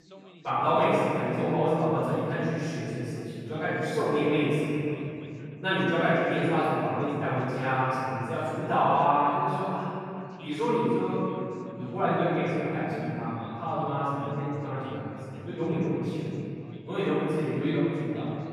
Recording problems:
room echo; strong; dies away in 3 s
off-mic speech; far
background chatter; faint; throughout; 2 voices, 25 dB below the speech

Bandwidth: 15 kHz